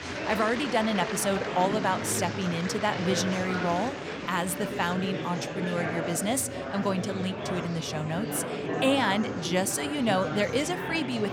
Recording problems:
murmuring crowd; loud; throughout; 4 dB below the speech

